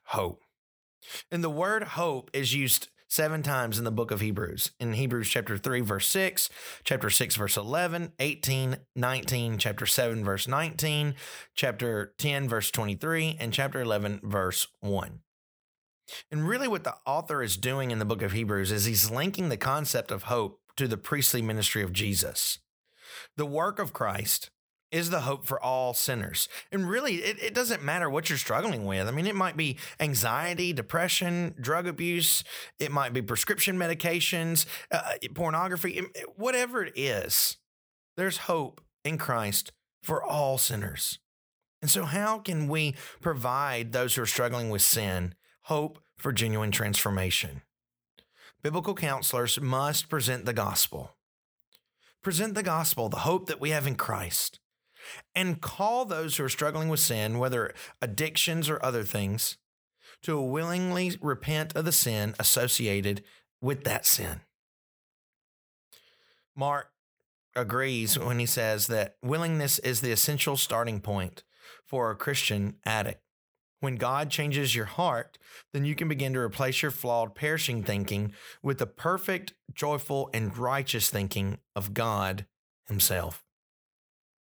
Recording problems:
none

